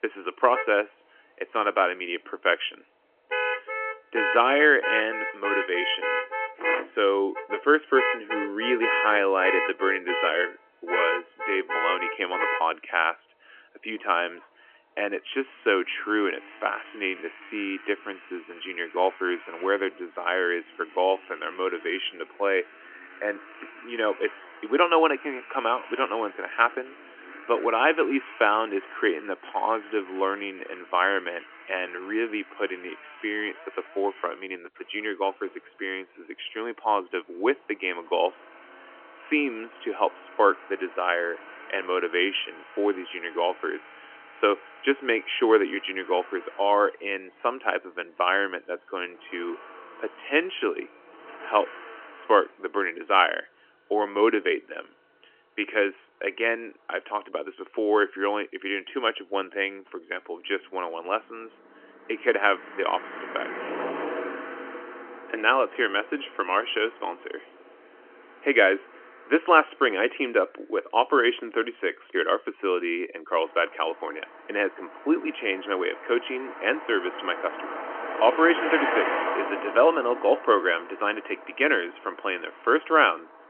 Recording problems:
phone-call audio; nothing above 3 kHz
traffic noise; loud; throughout; 7 dB below the speech

